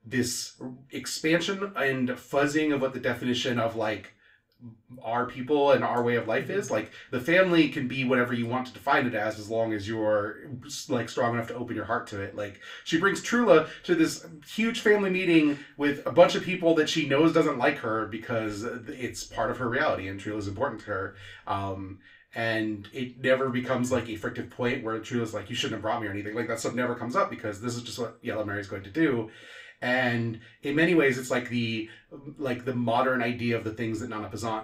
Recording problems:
room echo; very slight; dies away in 0.3 s
off-mic speech; somewhat distant

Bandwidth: 15.5 kHz